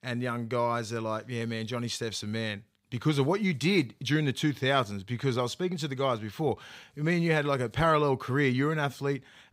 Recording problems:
none

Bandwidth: 15.5 kHz